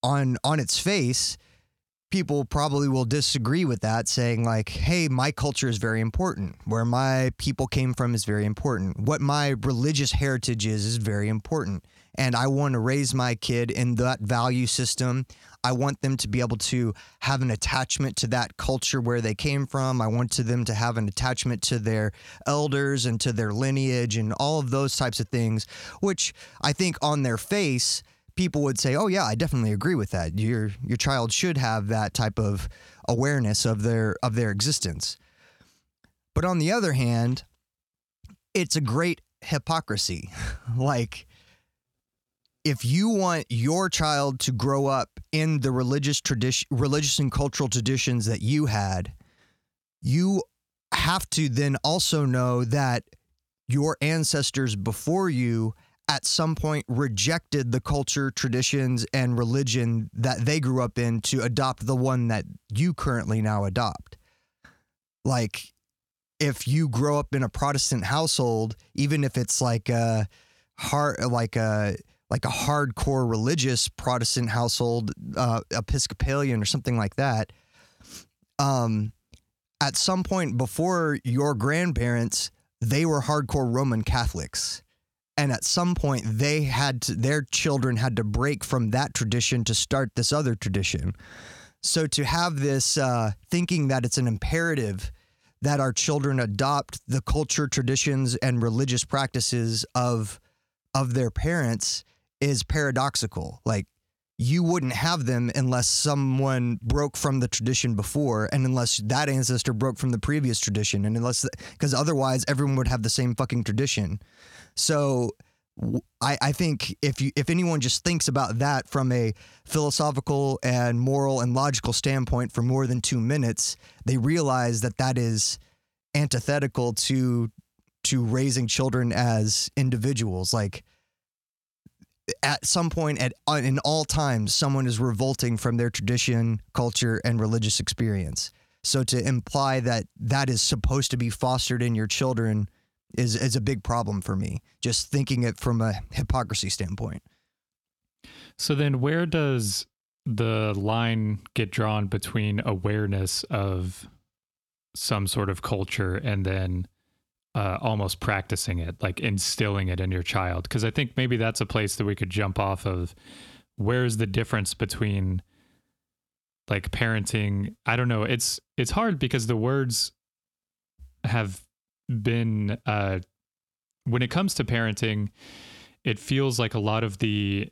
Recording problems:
squashed, flat; somewhat

